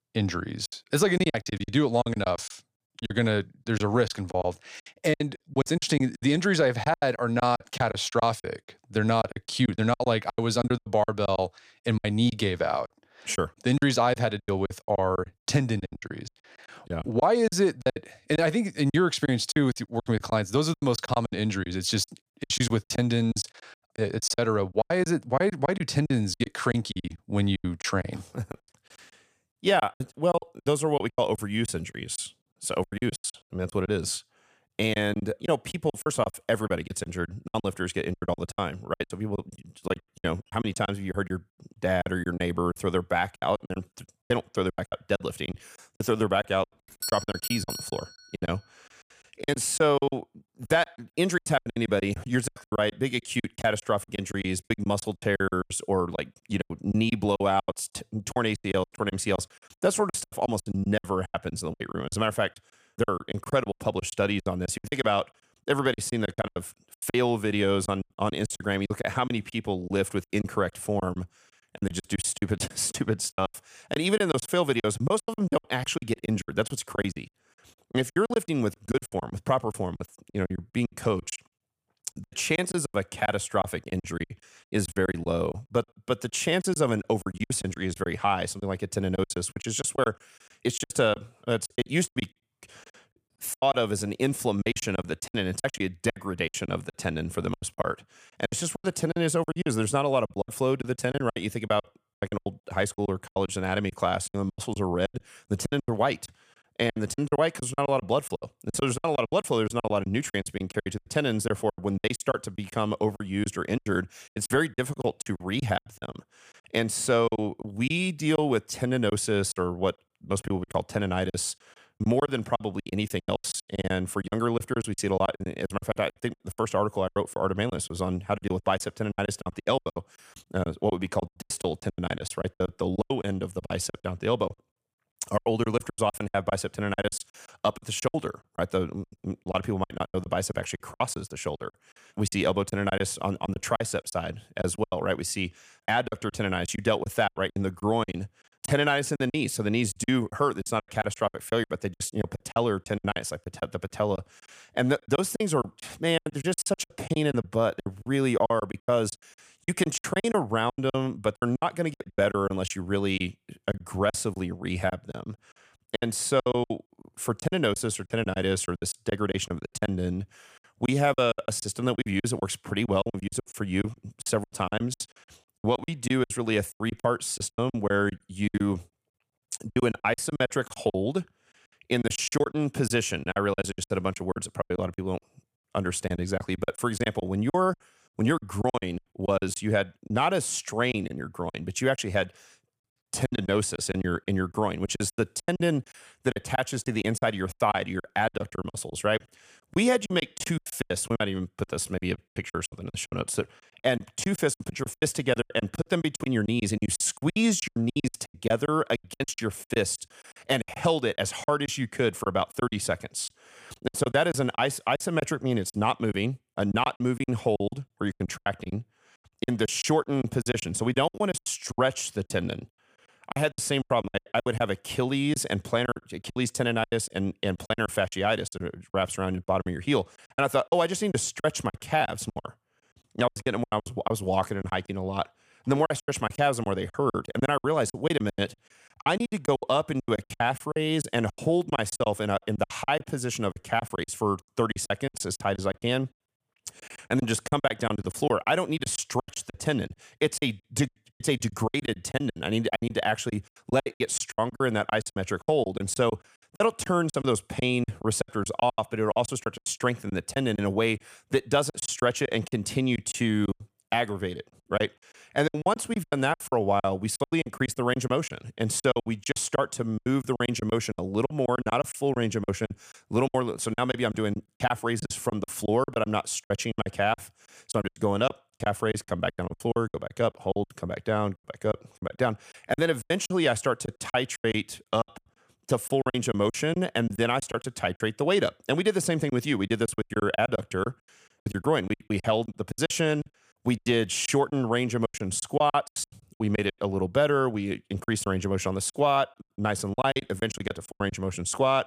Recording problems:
choppy; very; 17% of the speech affected
doorbell; noticeable; from 47 to 48 s; peak 4 dB below the speech

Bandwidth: 15 kHz